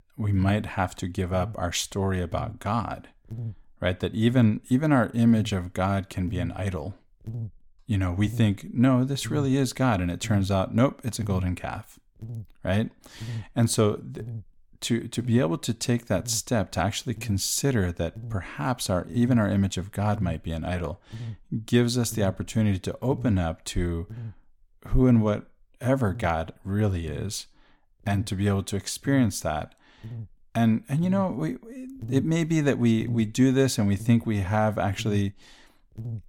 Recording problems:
electrical hum; faint; throughout; 50 Hz, 20 dB below the speech

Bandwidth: 17 kHz